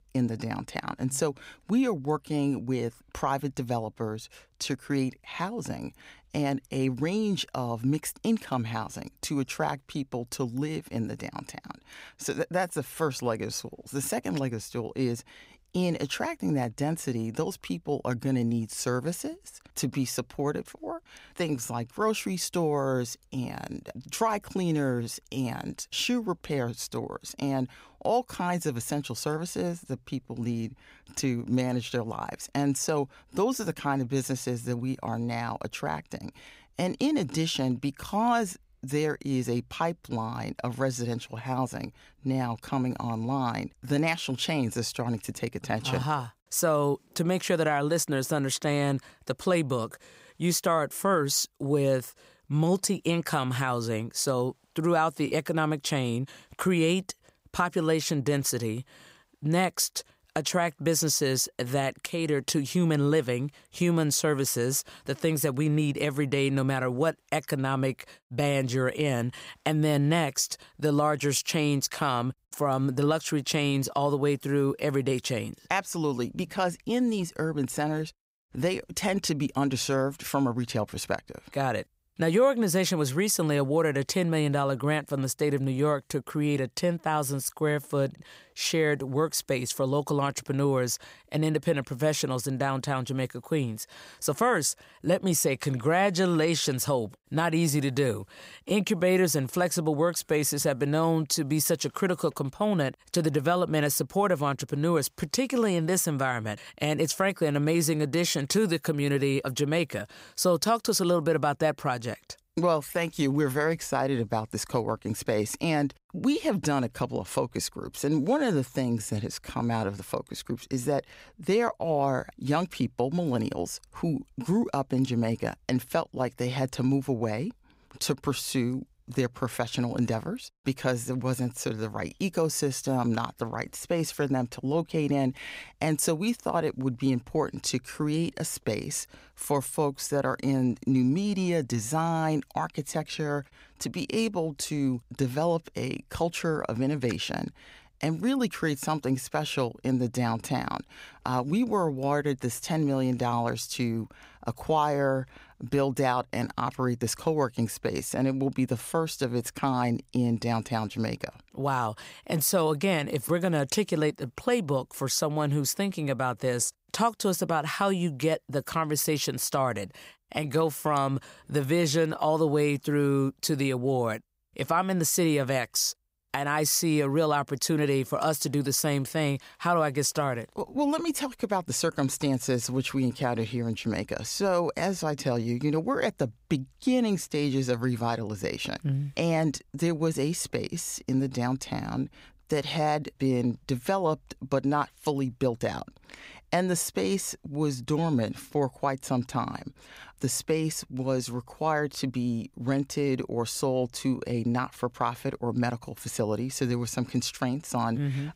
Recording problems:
none

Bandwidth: 15.5 kHz